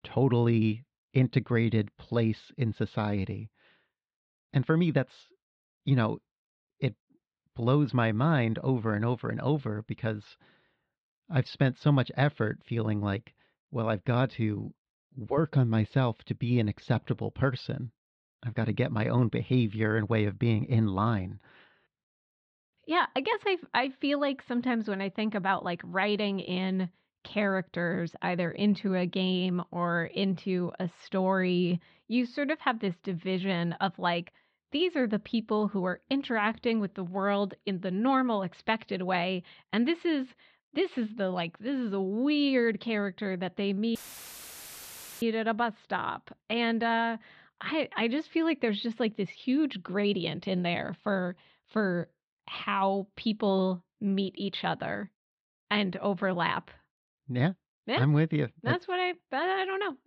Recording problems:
muffled; slightly; fading above 4 kHz
audio cutting out; filled with static; at 44 s for 1.5 s

